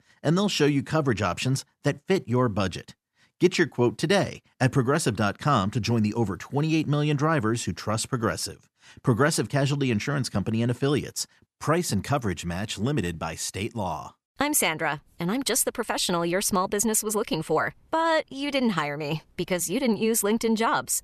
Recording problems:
none

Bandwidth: 13.5 kHz